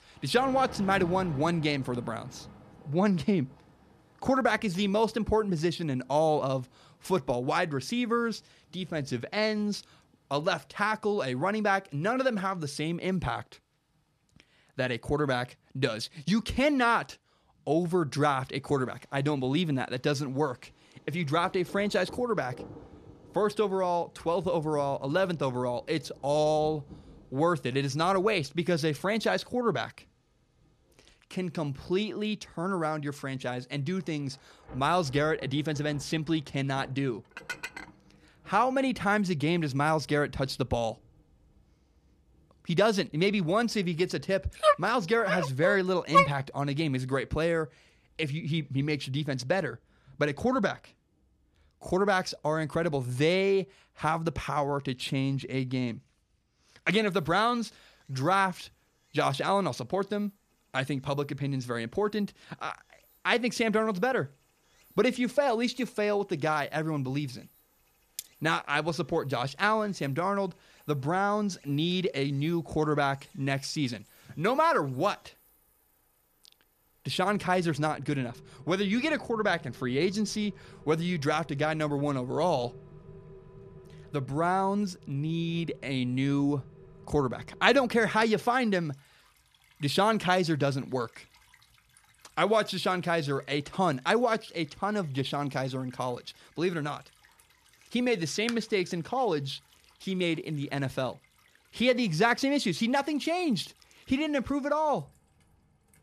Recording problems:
rain or running water; faint; throughout; 25 dB below the speech
clattering dishes; noticeable; at 37 s; peak 9 dB below the speech
dog barking; loud; from 45 to 46 s; peak 6 dB above the speech
clattering dishes; very faint; at 1:08; peak 15 dB below the speech

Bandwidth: 14.5 kHz